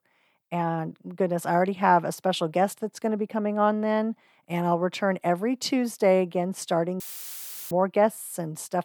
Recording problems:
audio cutting out; filled with static; at 7 s for 0.5 s

